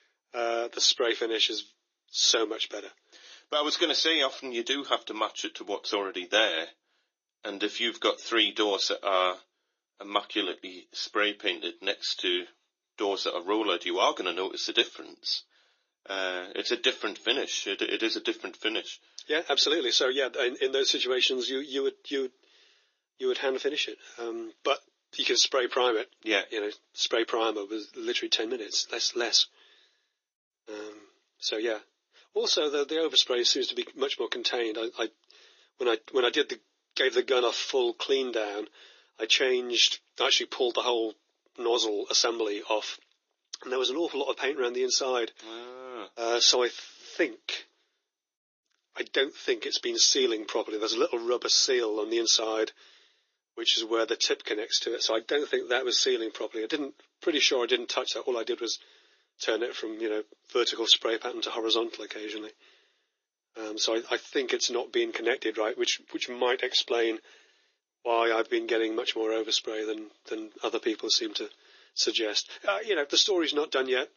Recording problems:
thin; very; fading below 300 Hz
garbled, watery; slightly; nothing above 6.5 kHz

